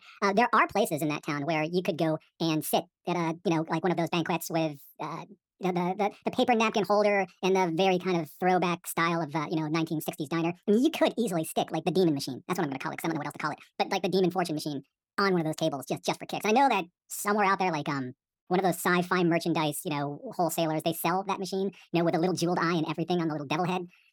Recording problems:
wrong speed and pitch; too fast and too high; 1.5 times normal speed

